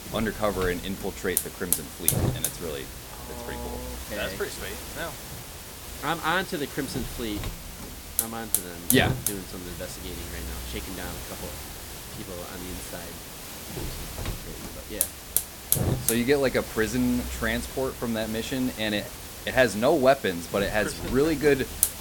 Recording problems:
hiss; loud; throughout; 4 dB below the speech

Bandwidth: 17.5 kHz